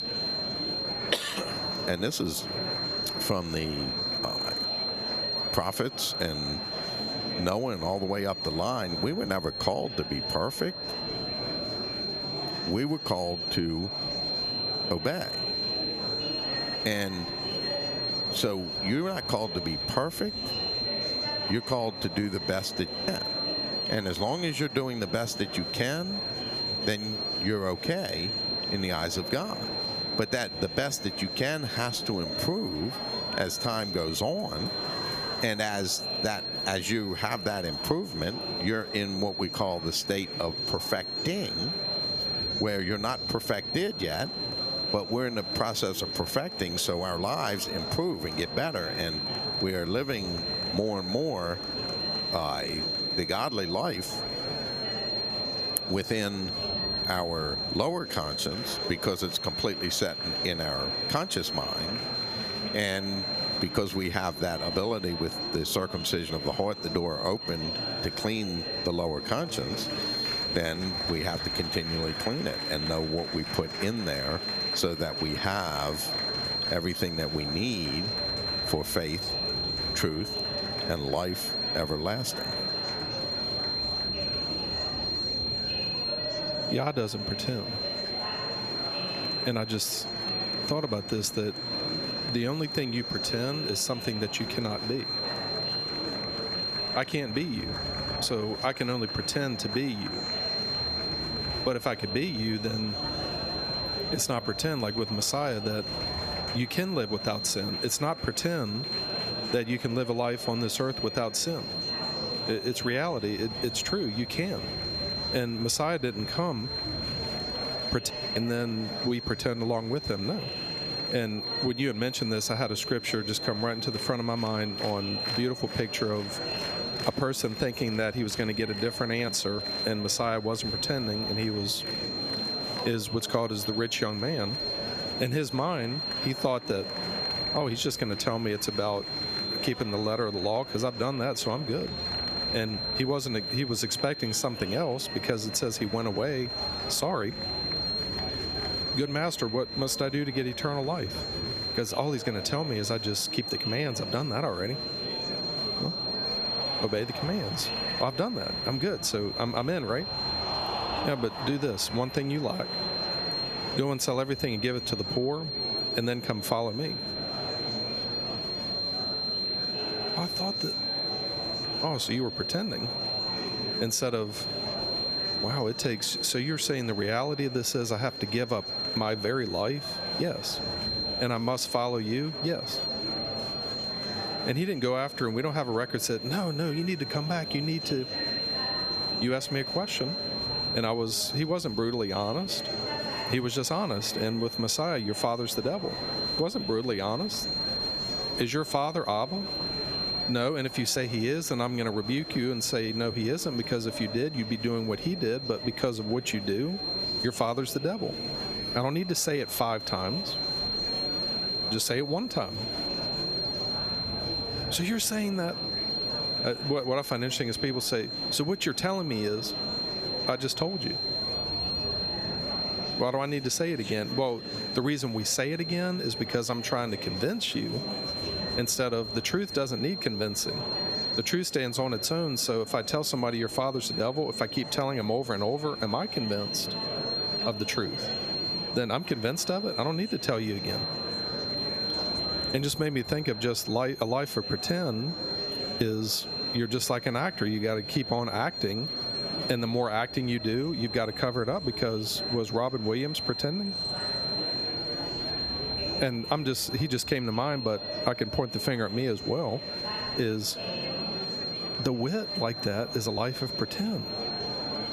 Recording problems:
squashed, flat; somewhat, background pumping
high-pitched whine; loud; throughout; 4 kHz, 2 dB below the speech
murmuring crowd; loud; throughout; 10 dB below the speech

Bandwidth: 14.5 kHz